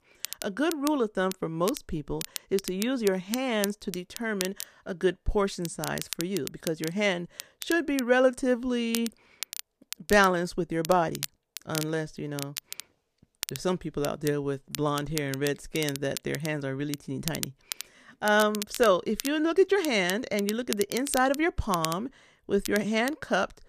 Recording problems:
crackle, like an old record; noticeable; 10 dB below the speech

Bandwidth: 14.5 kHz